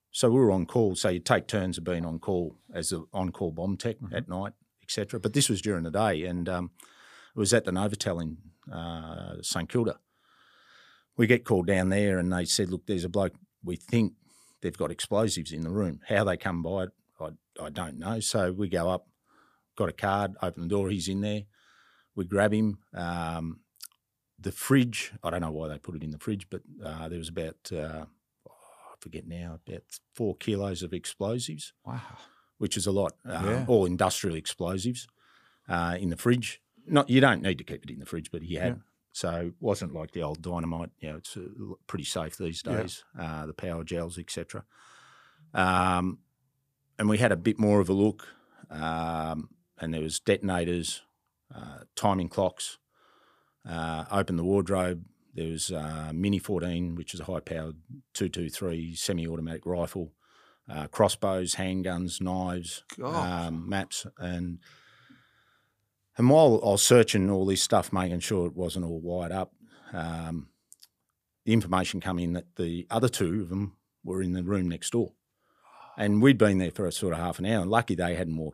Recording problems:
none

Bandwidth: 15 kHz